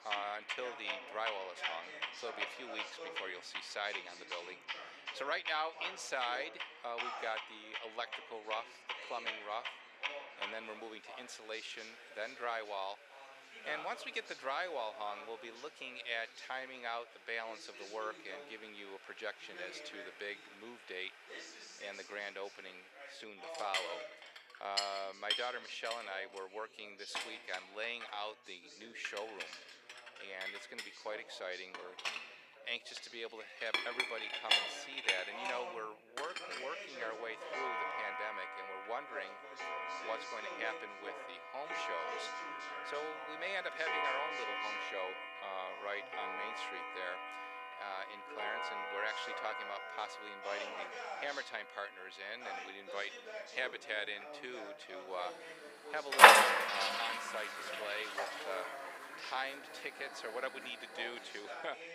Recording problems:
thin; very; fading below 450 Hz
household noises; very loud; throughout; 7 dB above the speech
background chatter; loud; throughout; 3 voices, 8 dB below the speech

